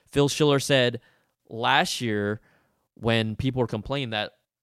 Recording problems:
none

